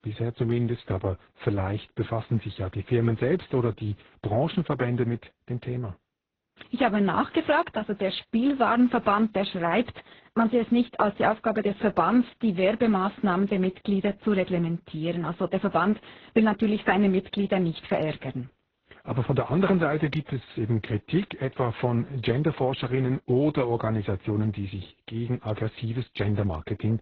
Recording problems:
garbled, watery; badly; nothing above 6.5 kHz

